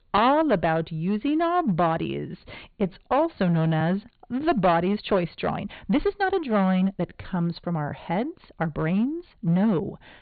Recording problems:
high frequencies cut off; severe; nothing above 4.5 kHz
distortion; slight; 7% of the sound clipped
uneven, jittery; strongly; from 2 to 9.5 s

